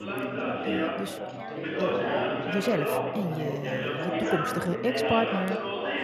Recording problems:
chatter from many people; very loud; throughout; 2 dB above the speech

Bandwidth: 14.5 kHz